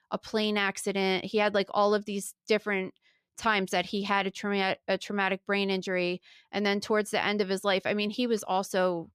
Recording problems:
none

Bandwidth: 14.5 kHz